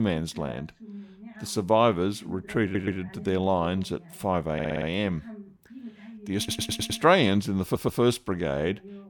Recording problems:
voice in the background; noticeable; throughout; 20 dB below the speech
abrupt cut into speech; at the start
audio stuttering; 4 times, first at 2.5 s

